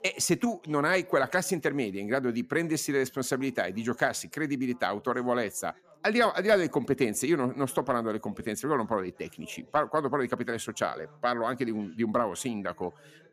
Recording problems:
background chatter; faint; throughout; 2 voices, 30 dB below the speech

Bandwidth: 14.5 kHz